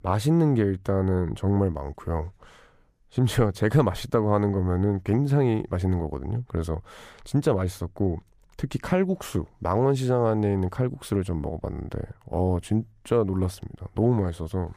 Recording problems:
none

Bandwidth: 15 kHz